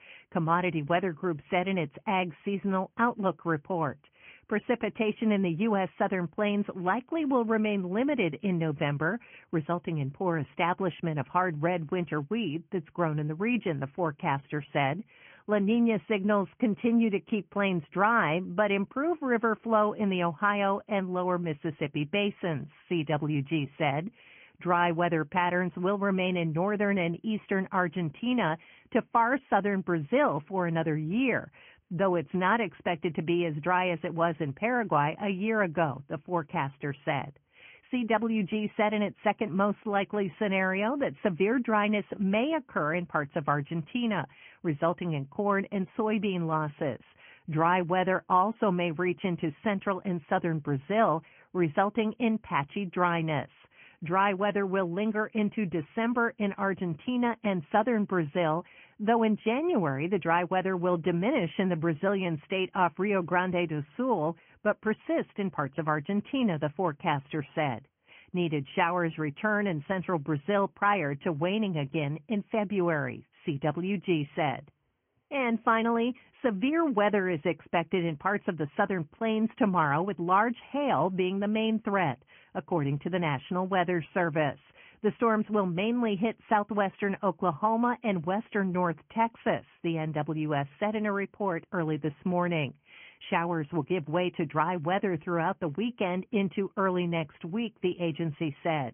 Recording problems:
high frequencies cut off; severe; nothing above 3 kHz
garbled, watery; slightly

